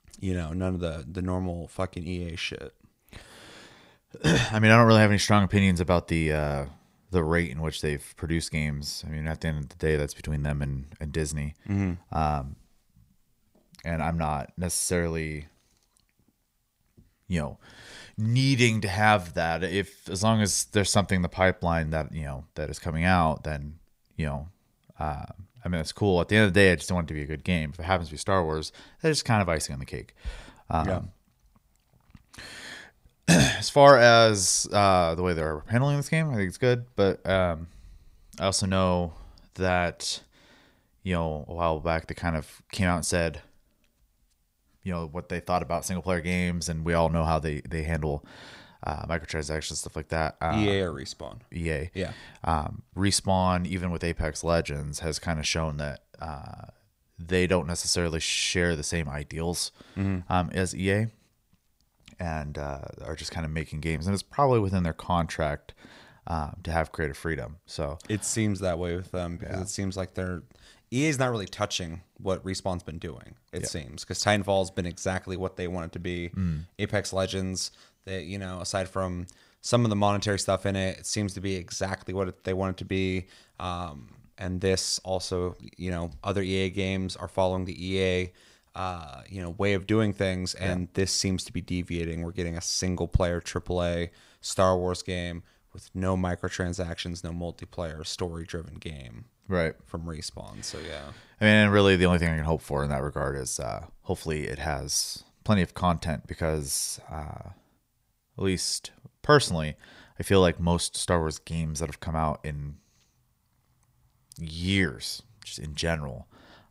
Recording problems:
none

